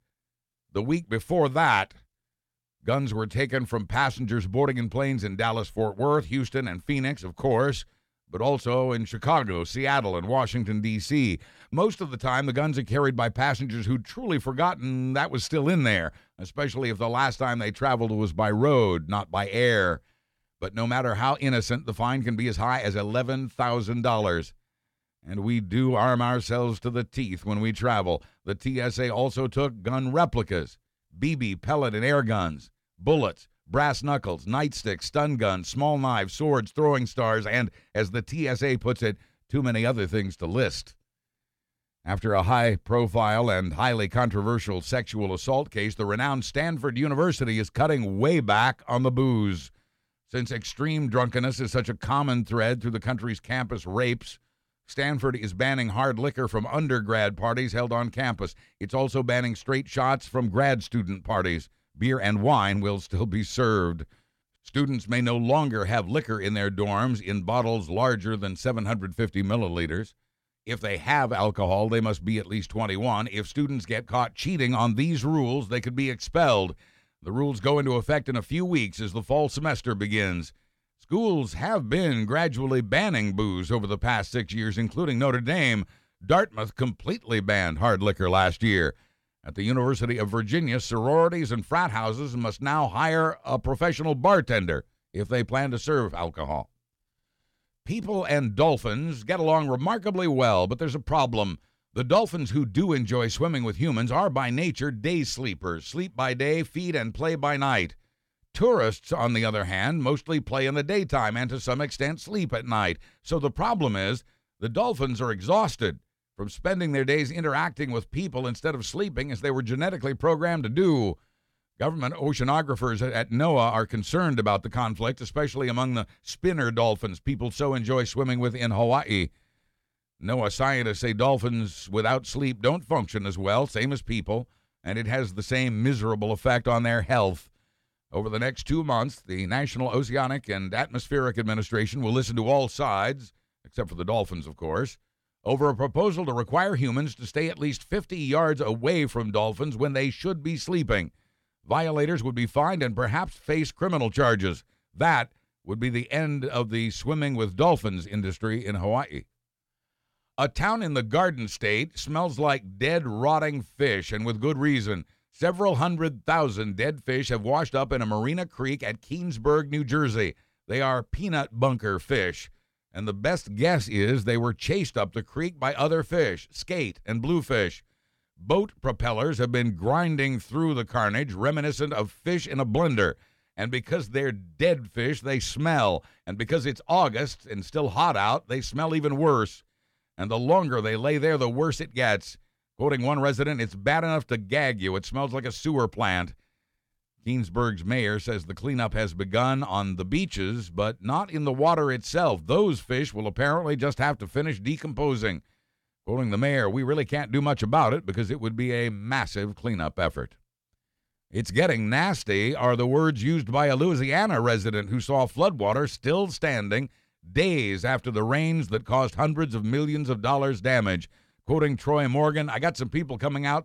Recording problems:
none

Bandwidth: 17 kHz